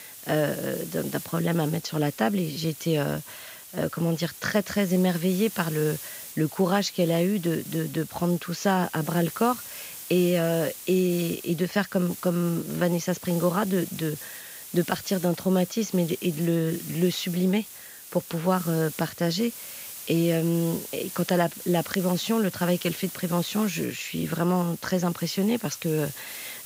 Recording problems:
high frequencies cut off; noticeable; nothing above 7.5 kHz
hiss; noticeable; throughout; 10 dB below the speech

